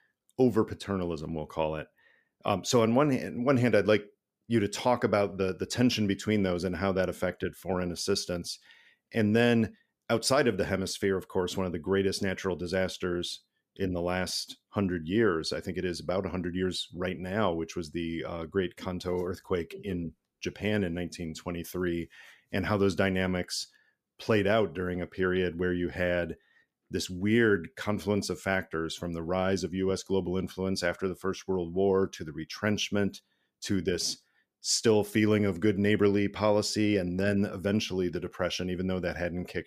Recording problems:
none

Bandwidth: 15 kHz